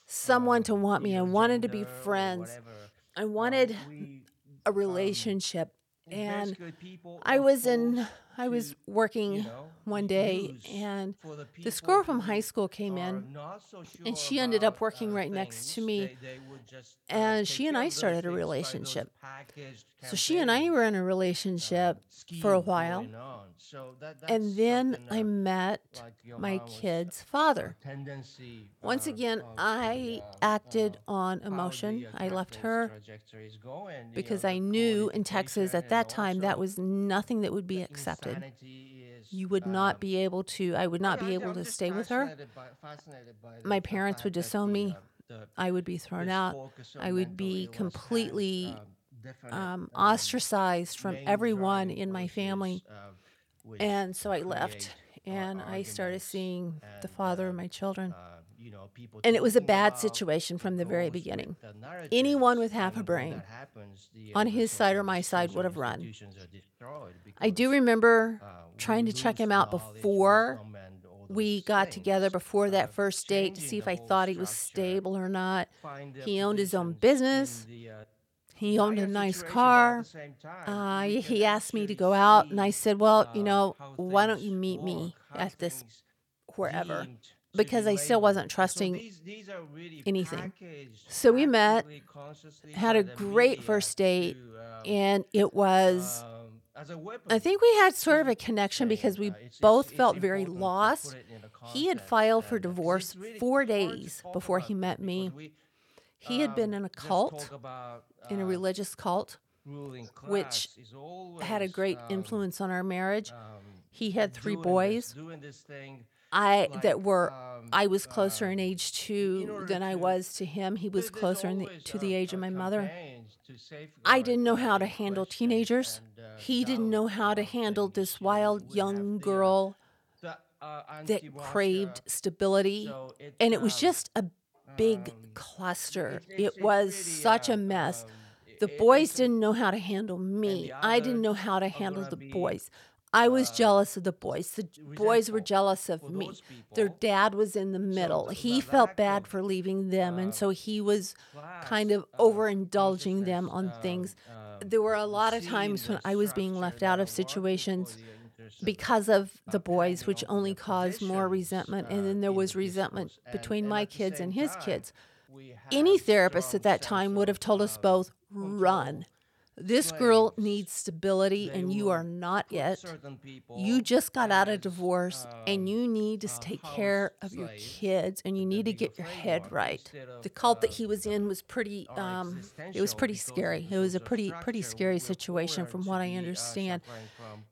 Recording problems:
voice in the background; noticeable; throughout; 20 dB below the speech

